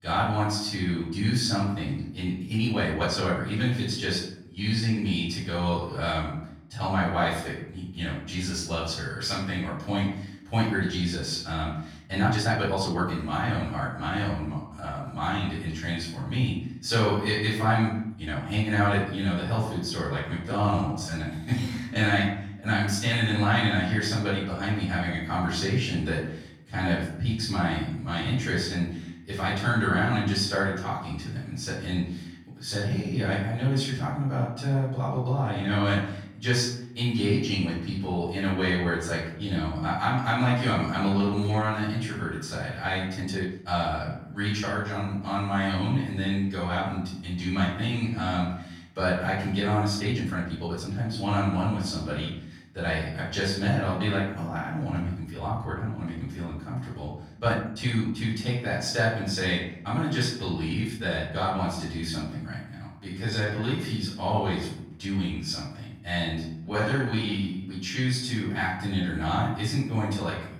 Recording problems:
off-mic speech; far
room echo; noticeable; dies away in 0.7 s
uneven, jittery; strongly; from 2.5 s to 1:08

